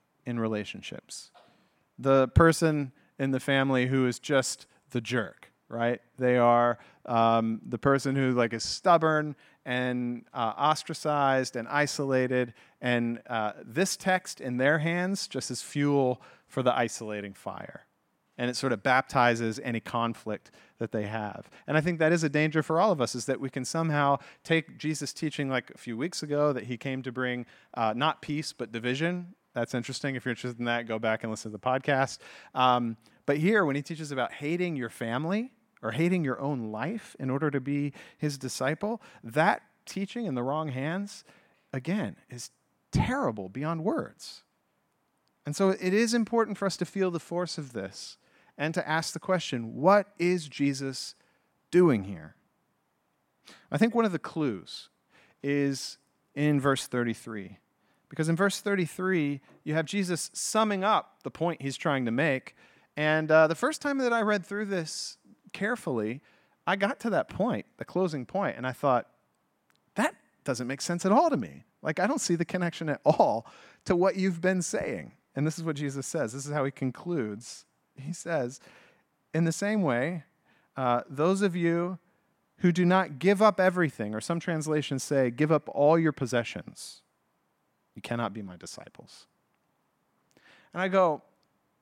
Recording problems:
none

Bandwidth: 16.5 kHz